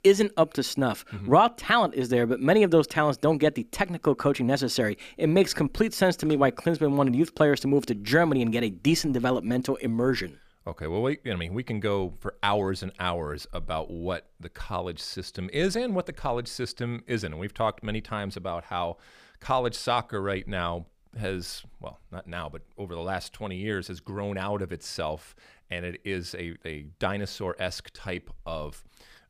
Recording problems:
none

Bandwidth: 15 kHz